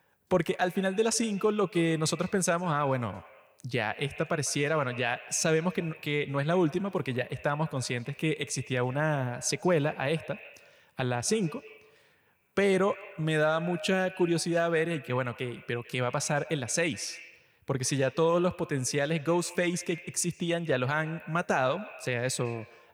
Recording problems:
echo of what is said; noticeable; throughout; 150 ms later, 15 dB below the speech

